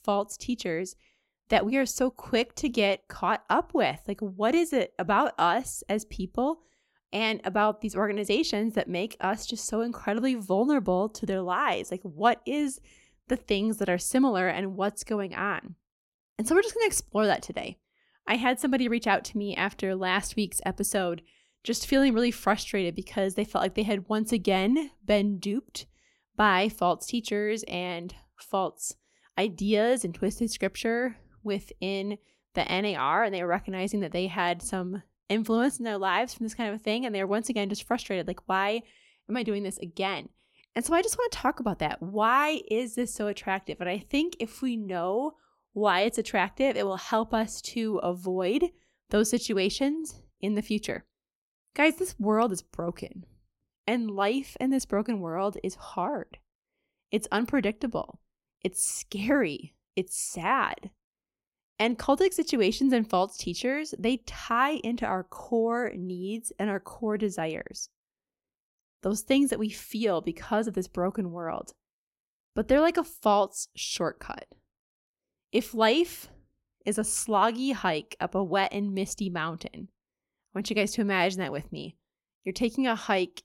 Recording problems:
none

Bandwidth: 16 kHz